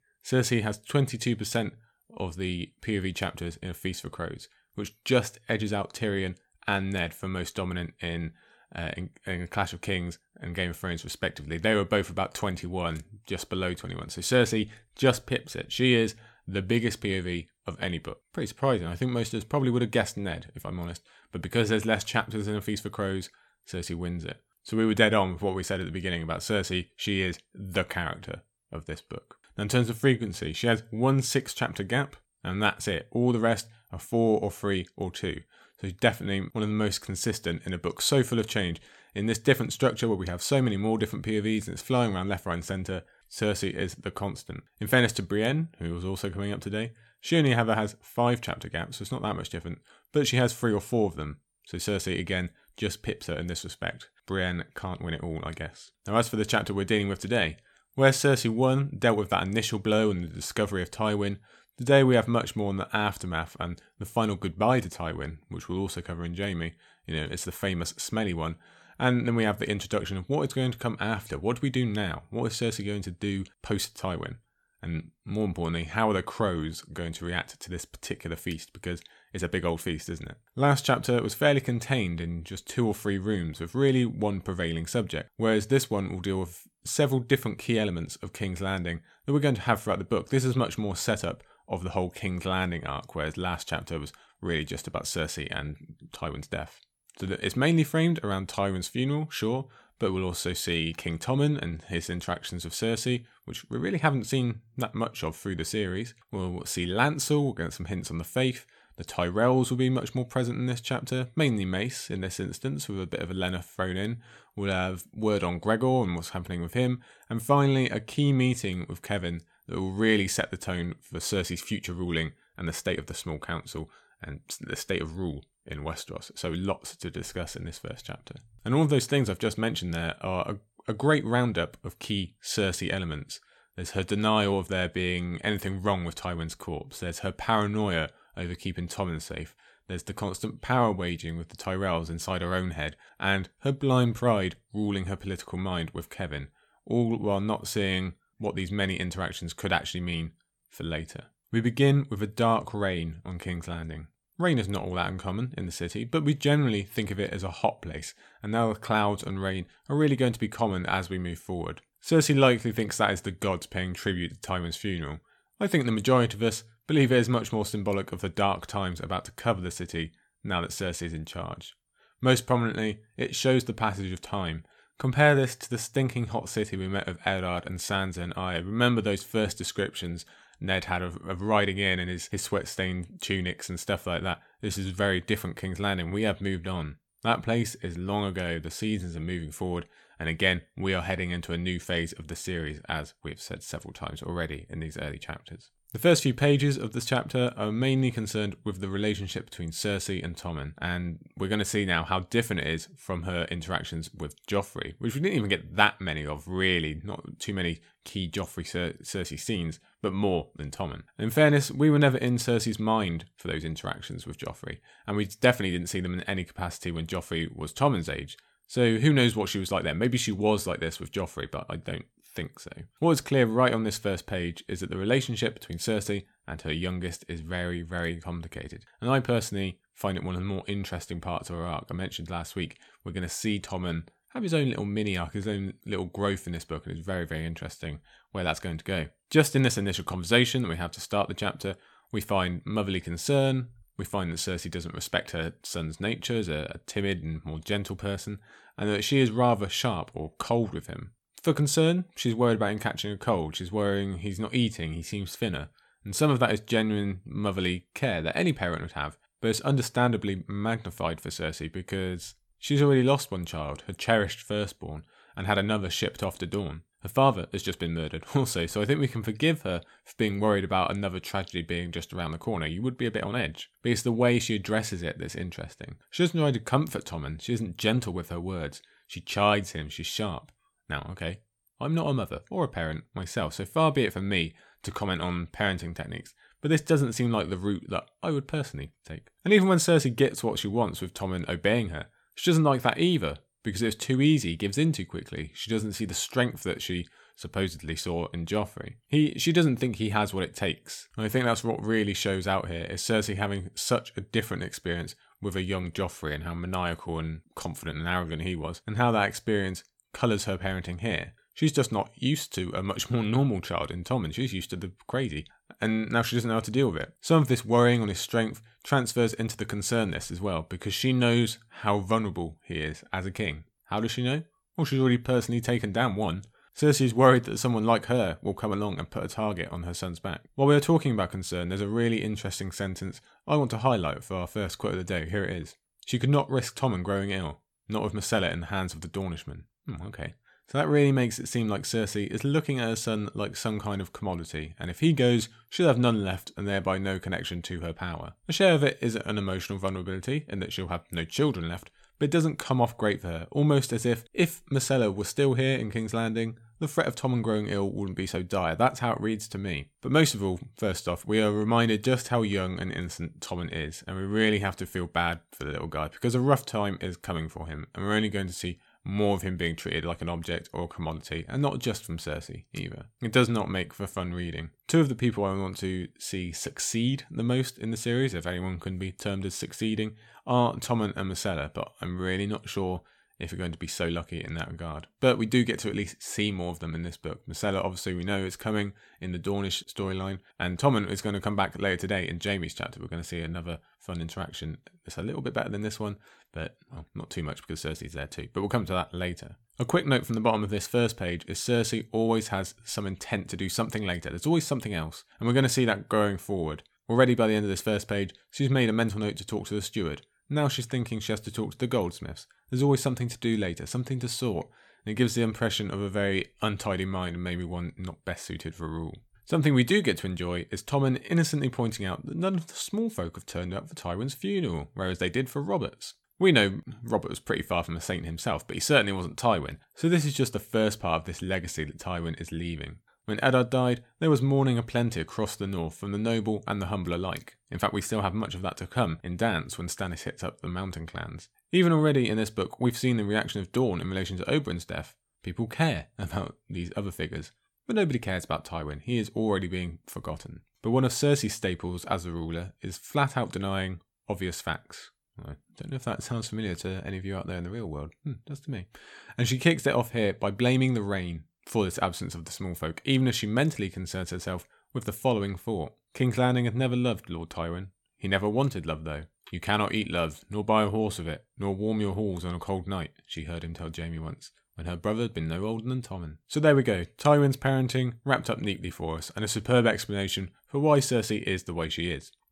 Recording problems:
none

